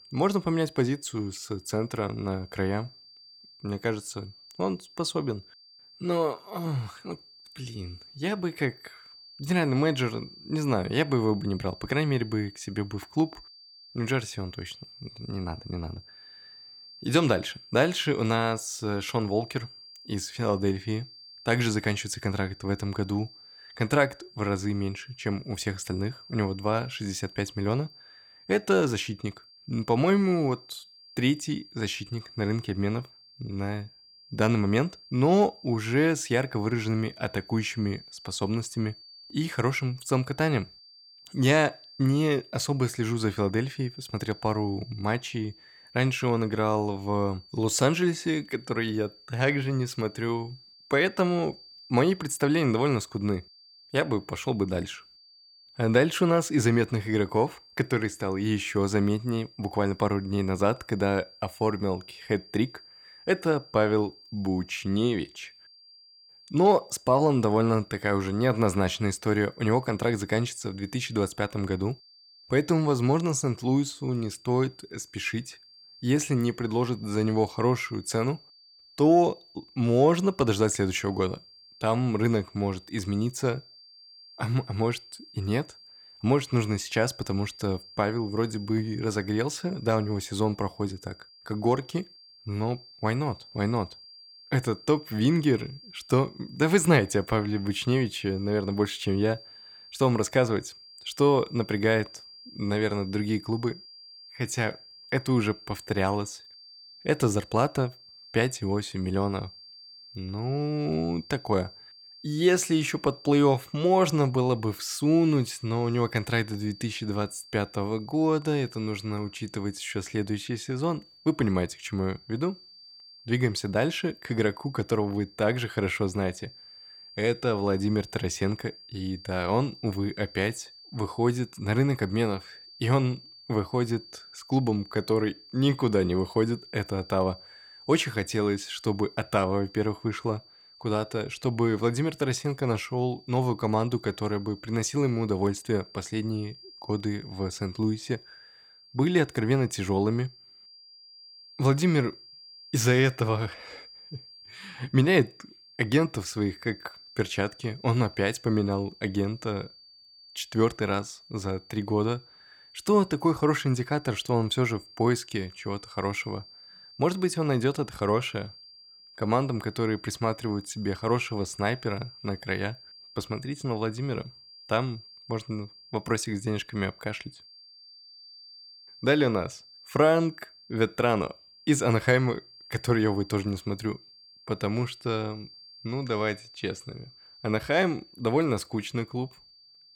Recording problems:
high-pitched whine; faint; throughout; 4.5 kHz, 20 dB below the speech

